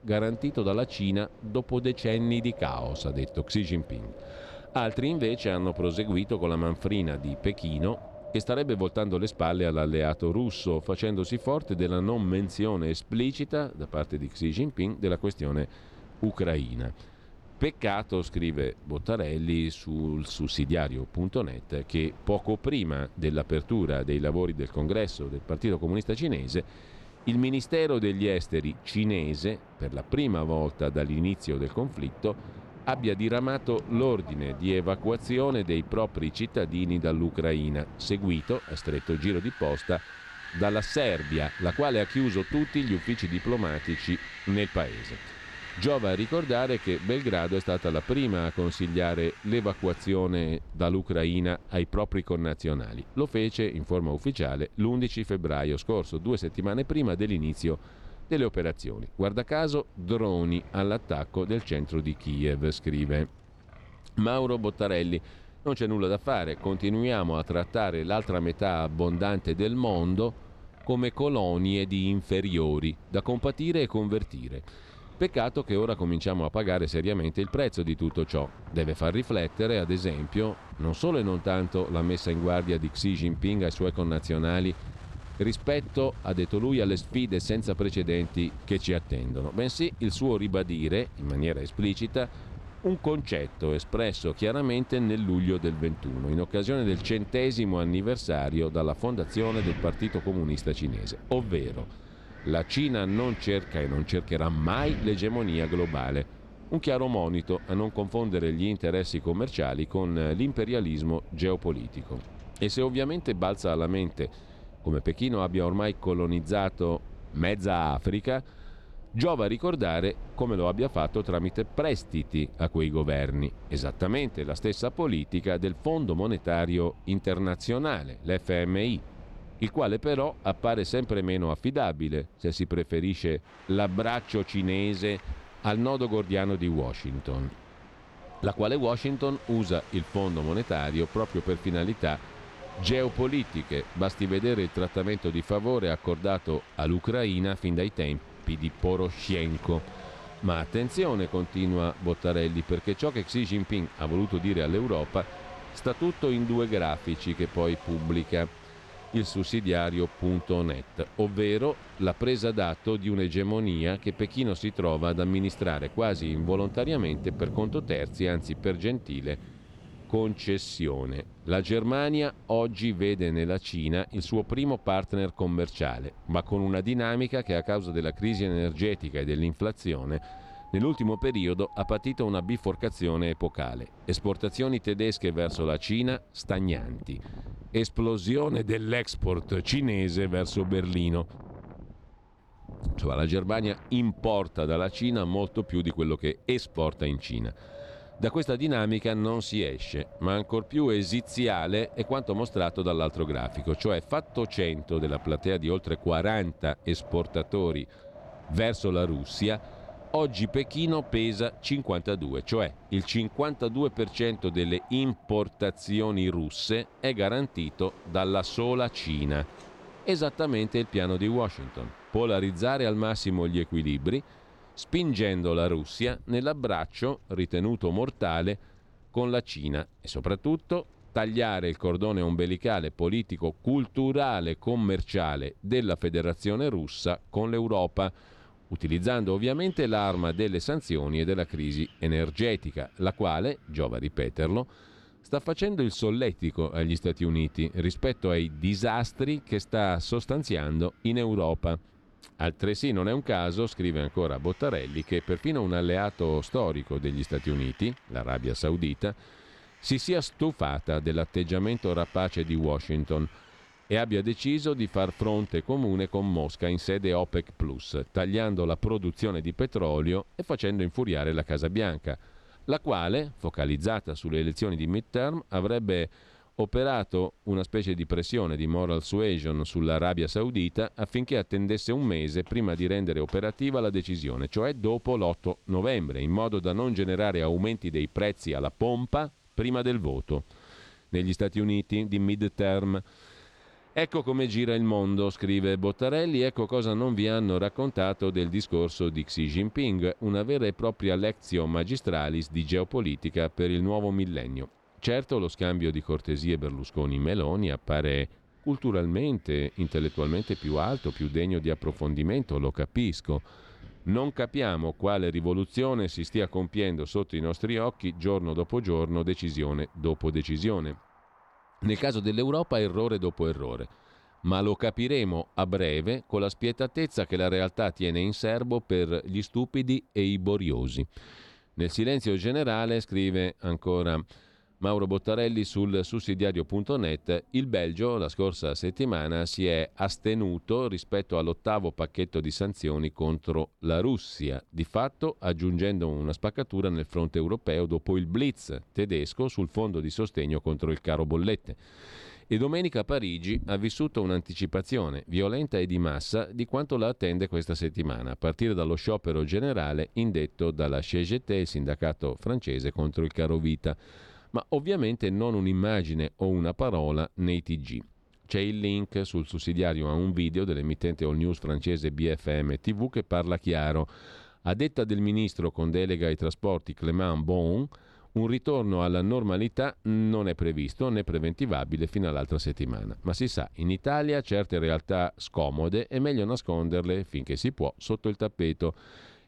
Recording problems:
wind in the background; noticeable; throughout; 20 dB below the speech

